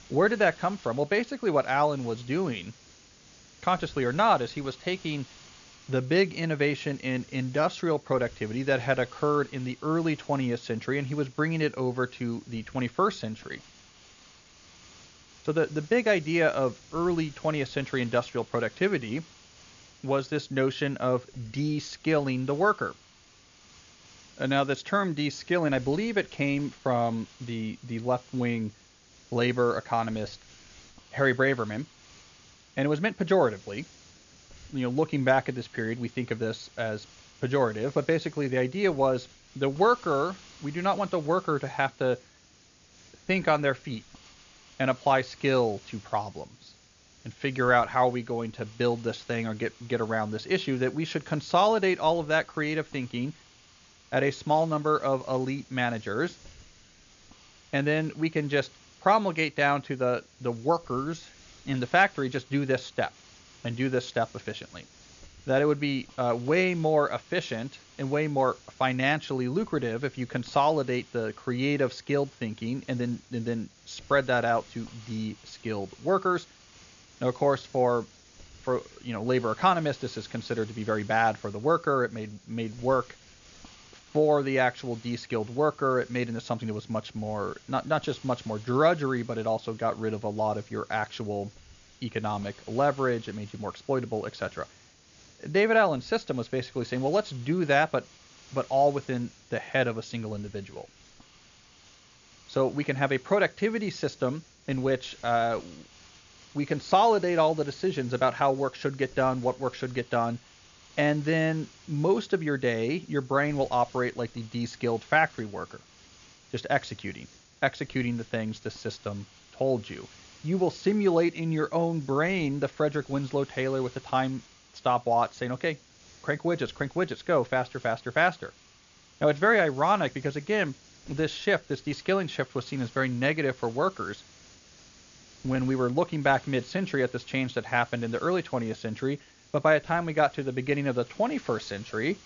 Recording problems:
high frequencies cut off; noticeable; nothing above 7 kHz
hiss; faint; throughout; 25 dB below the speech

